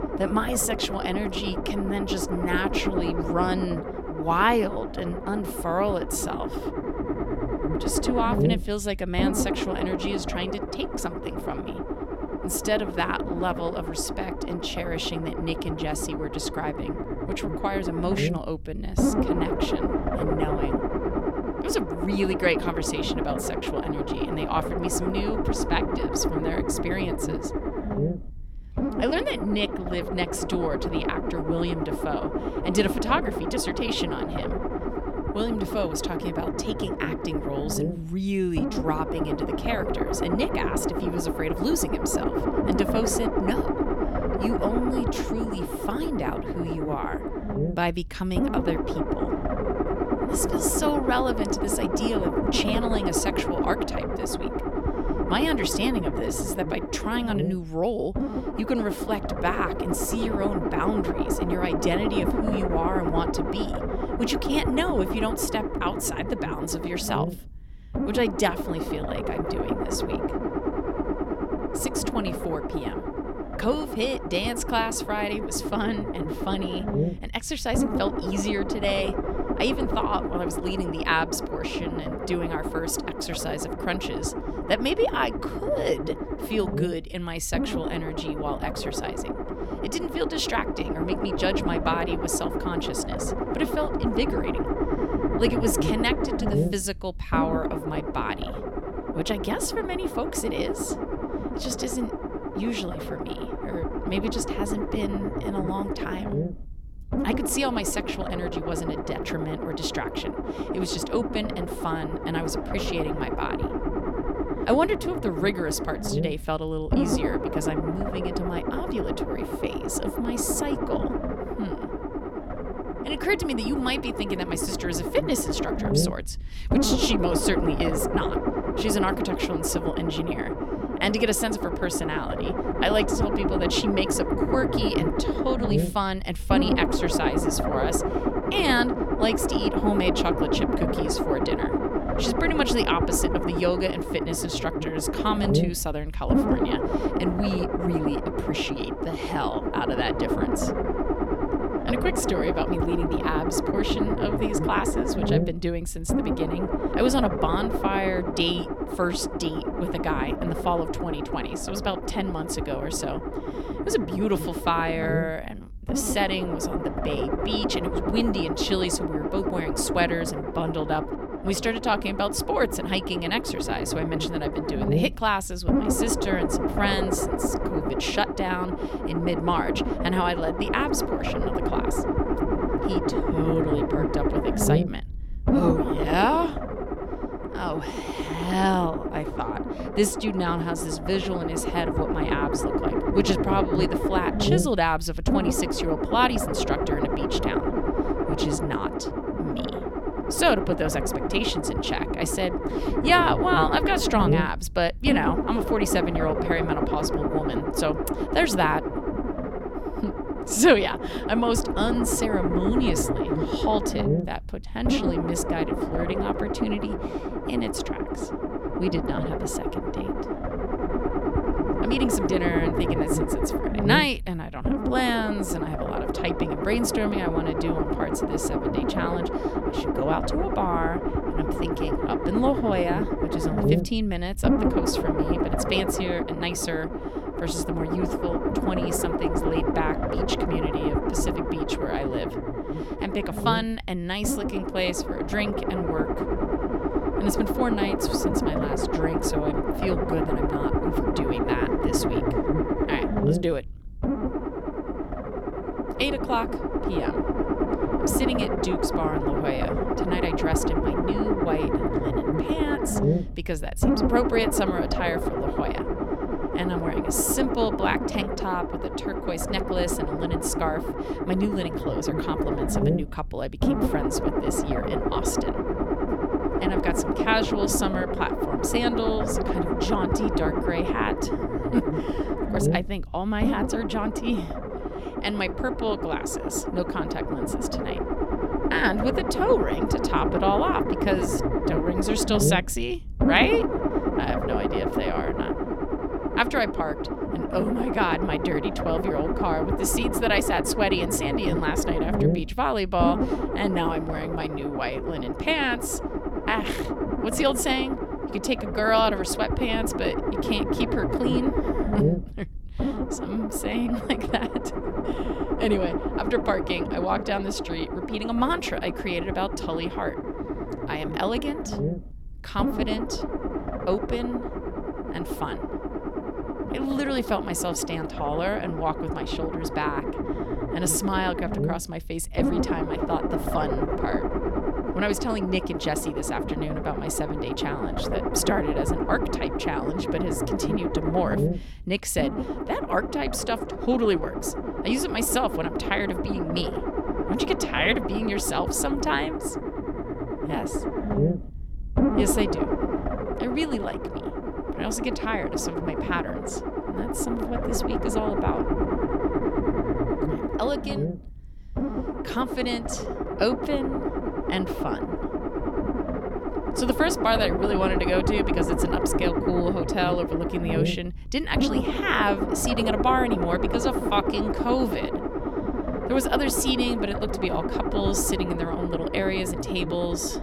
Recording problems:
low rumble; loud; throughout; 2 dB below the speech

